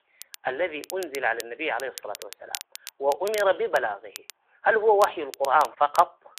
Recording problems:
thin; very; fading below 400 Hz
phone-call audio
crackle, like an old record; noticeable; 15 dB below the speech

